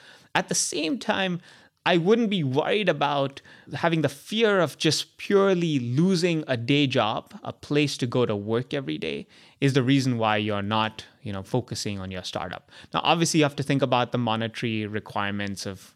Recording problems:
none

